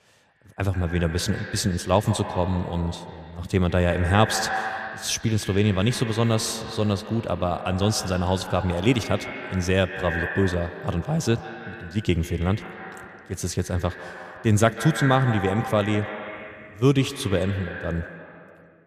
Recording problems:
echo of what is said; strong; throughout; 140 ms later, 9 dB below the speech

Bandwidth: 14.5 kHz